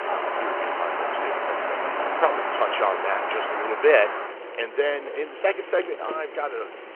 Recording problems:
phone-call audio; nothing above 3 kHz
traffic noise; loud; throughout; 2 dB below the speech

